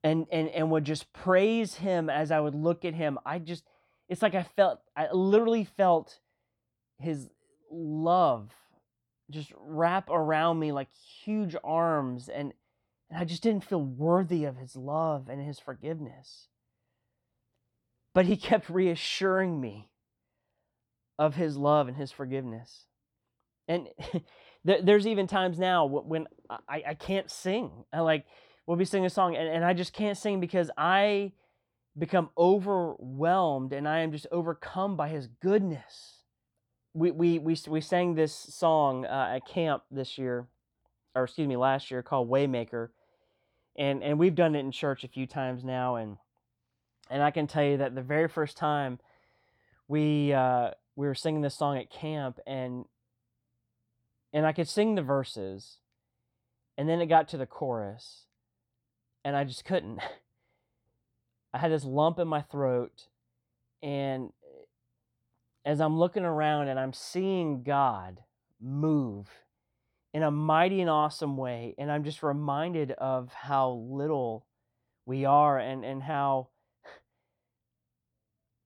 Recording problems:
none

